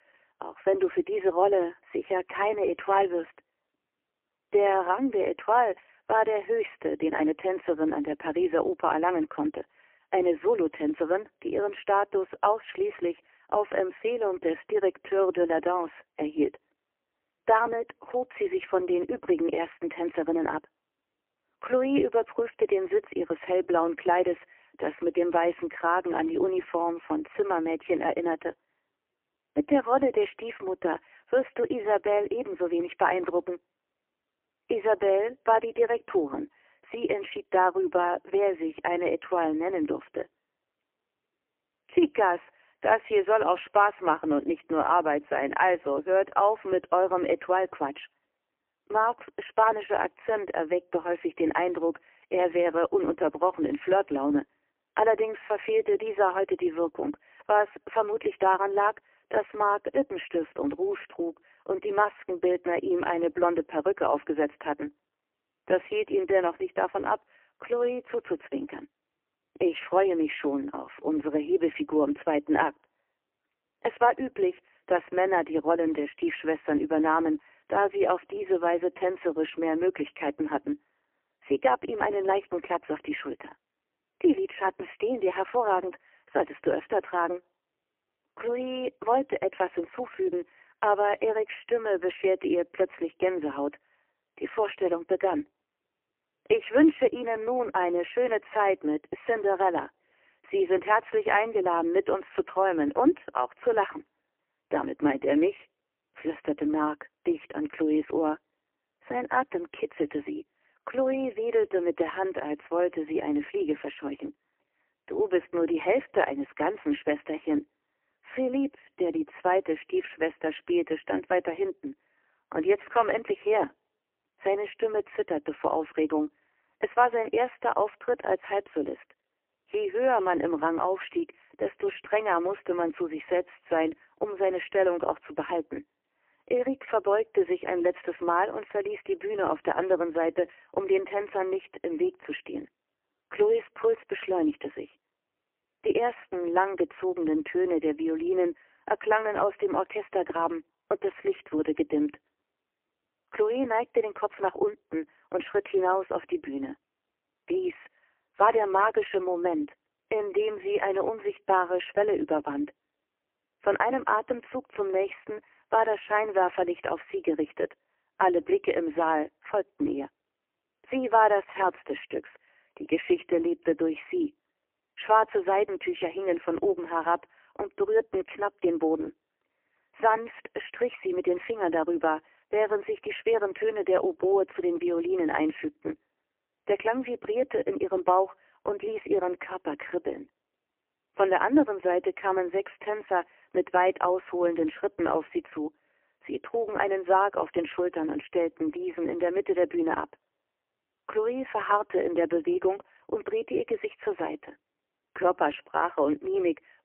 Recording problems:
phone-call audio; poor line; nothing above 3 kHz

